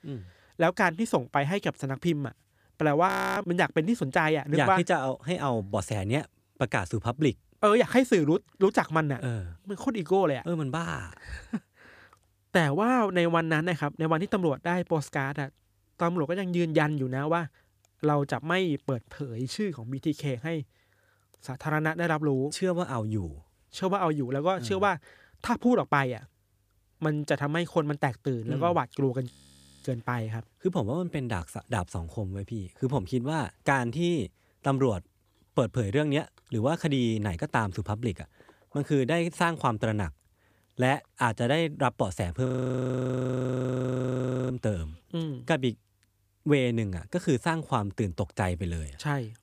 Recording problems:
audio freezing; at 3 s, at 29 s for 0.5 s and at 42 s for 2 s

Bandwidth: 15 kHz